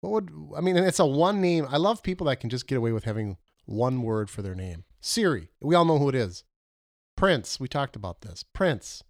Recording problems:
none

